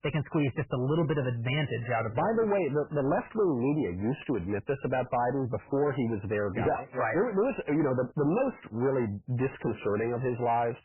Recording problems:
garbled, watery; badly; nothing above 3 kHz
distortion; slight; 10 dB below the speech

